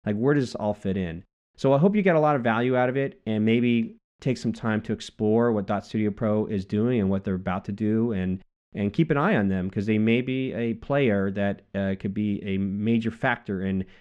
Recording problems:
muffled; slightly; fading above 2.5 kHz

